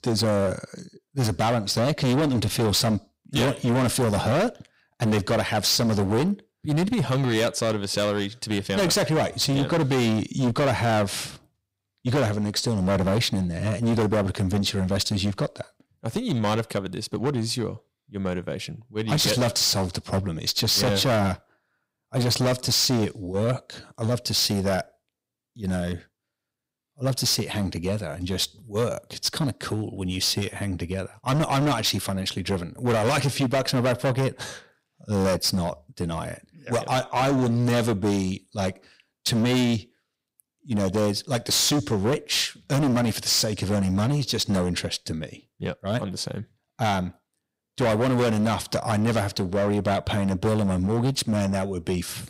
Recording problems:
distortion; heavy; 16% of the sound clipped

